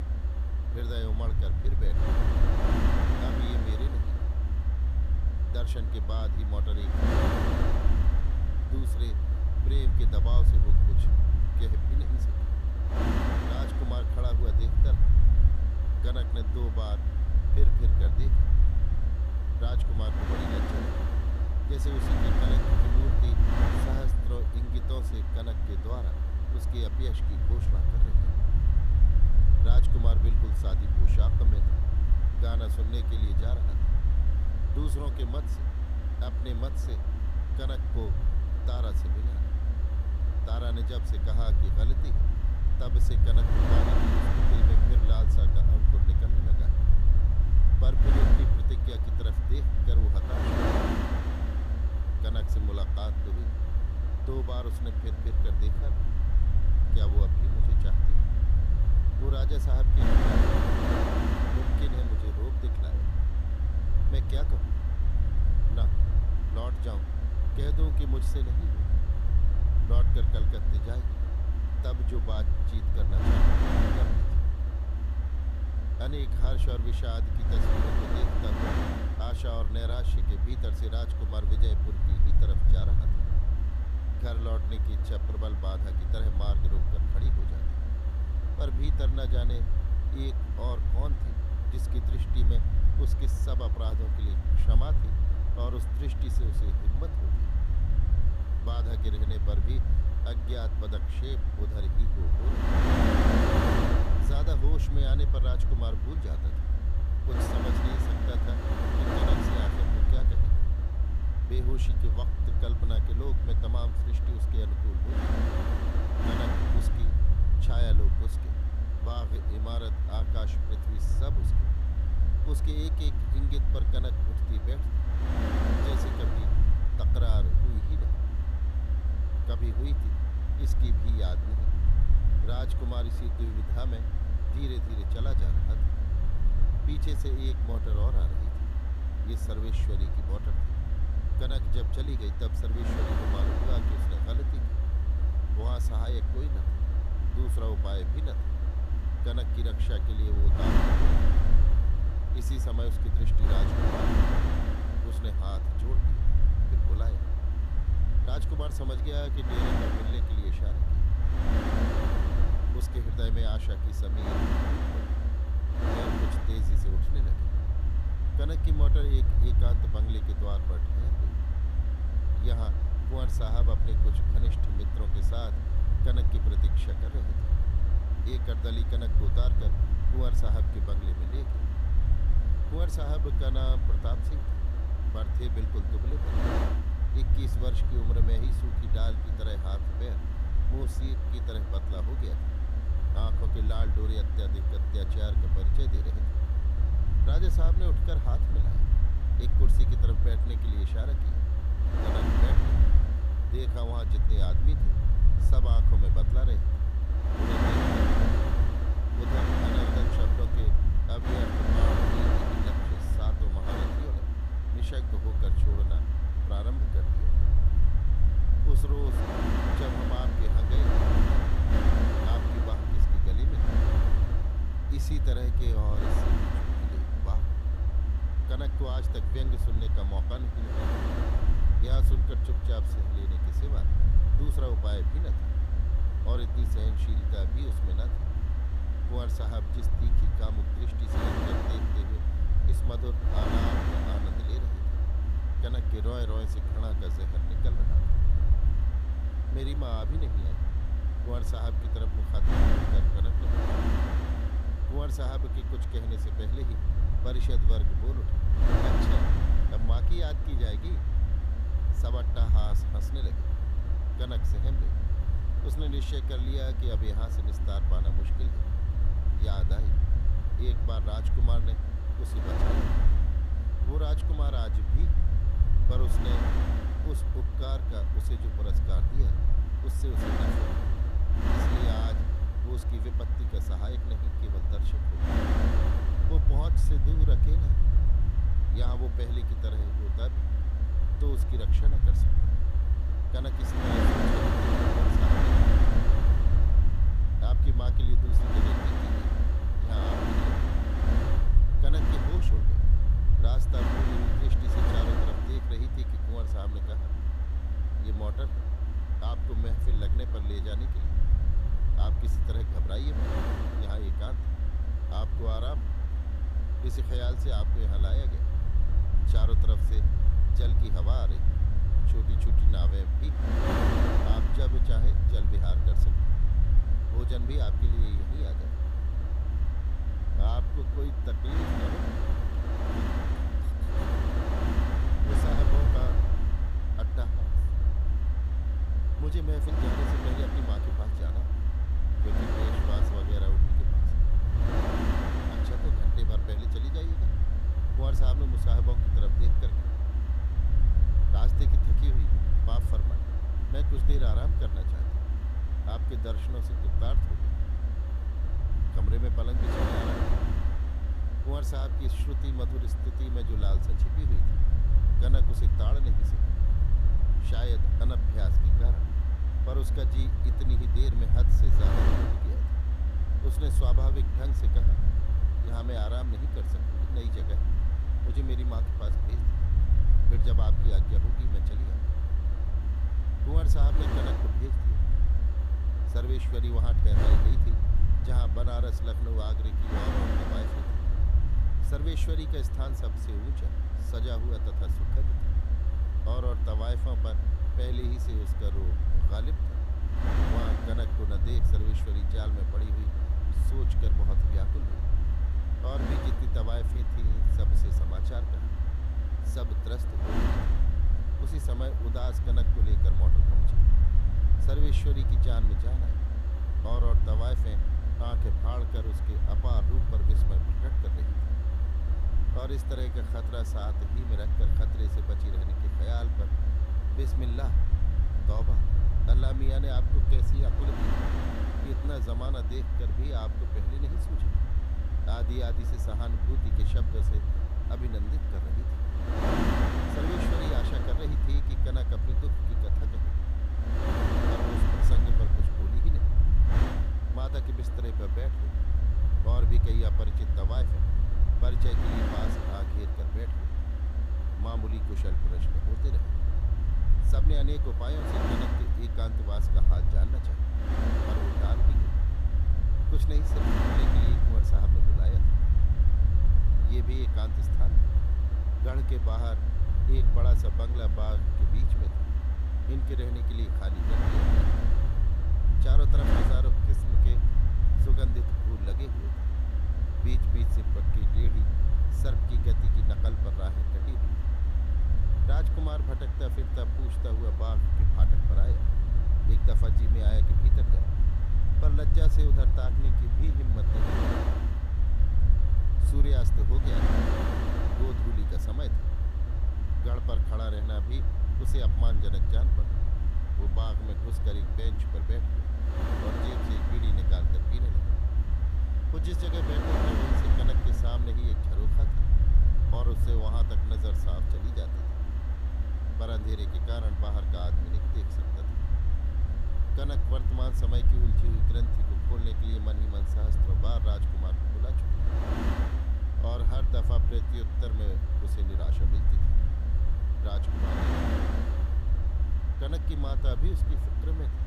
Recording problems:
wind noise on the microphone; heavy; 1 dB above the speech
low rumble; loud; throughout; 4 dB below the speech

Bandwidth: 14.5 kHz